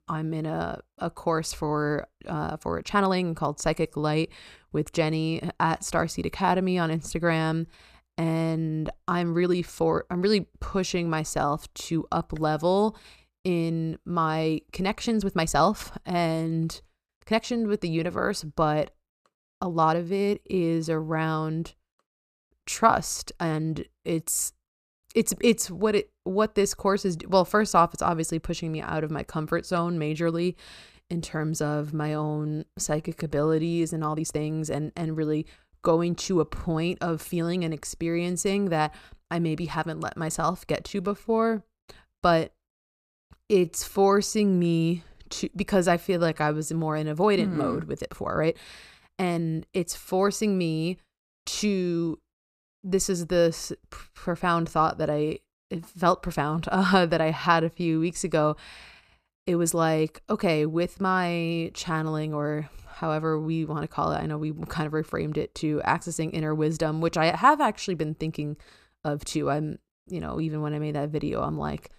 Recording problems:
uneven, jittery; strongly; from 2.5 s to 1:09

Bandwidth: 14.5 kHz